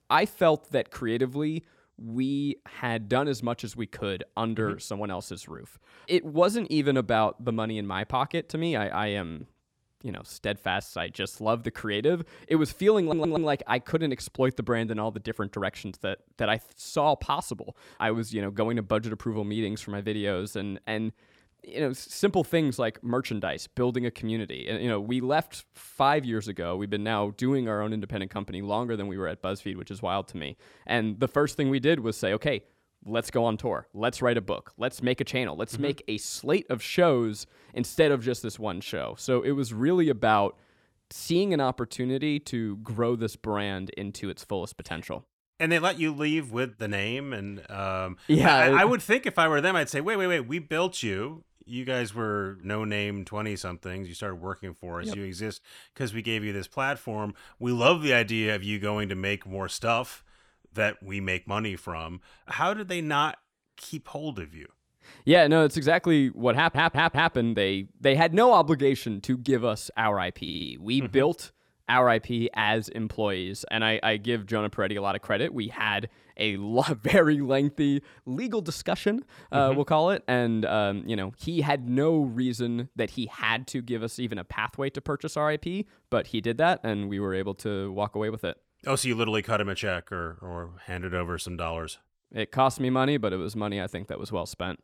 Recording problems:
audio stuttering; at 13 s, at 1:07 and at 1:10

